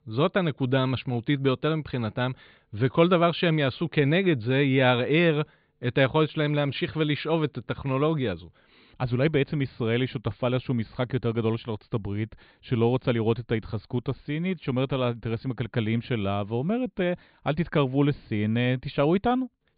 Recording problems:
high frequencies cut off; severe; nothing above 4.5 kHz

